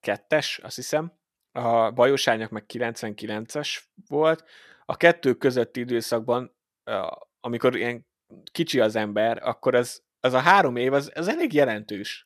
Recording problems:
none

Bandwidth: 13.5 kHz